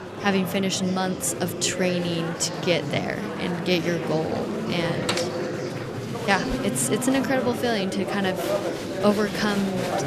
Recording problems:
murmuring crowd; loud; throughout; 4 dB below the speech

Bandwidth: 14 kHz